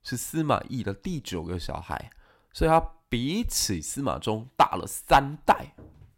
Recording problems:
machinery noise; faint; throughout; 30 dB below the speech

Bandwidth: 16 kHz